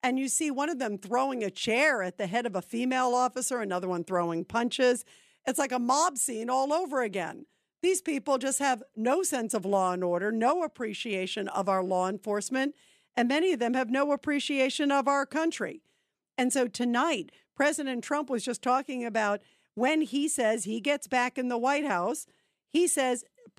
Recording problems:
none

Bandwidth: 14.5 kHz